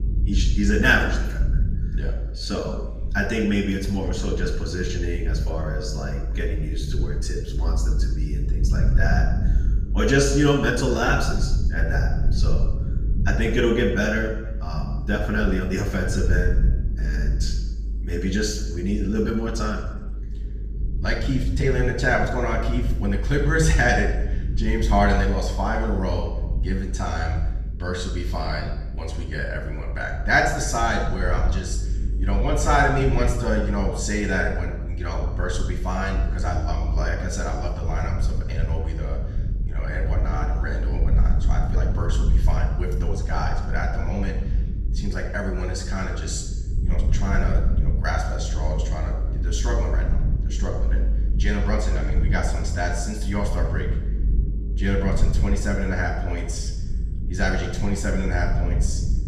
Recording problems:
off-mic speech; far
room echo; noticeable; dies away in 0.8 s
low rumble; noticeable; throughout; 15 dB below the speech
uneven, jittery; slightly; from 2.5 to 42 s

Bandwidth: 15 kHz